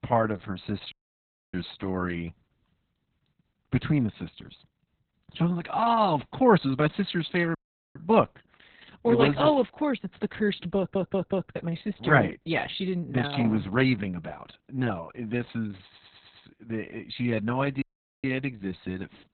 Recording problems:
garbled, watery; badly; nothing above 4 kHz
audio cutting out; at 1 s for 0.5 s, at 7.5 s and at 18 s
audio stuttering; at 11 s and at 16 s

